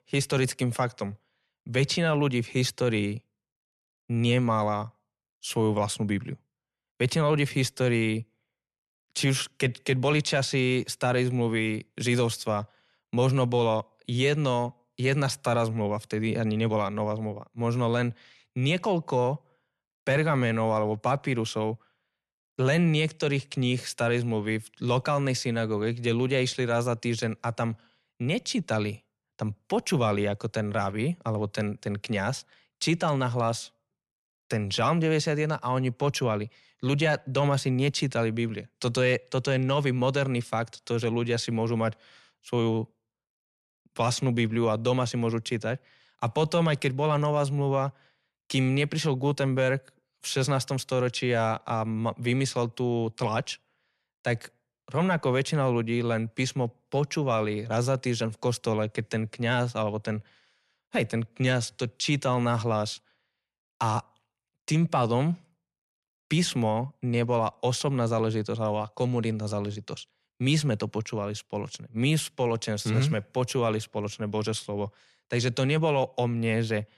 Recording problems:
none

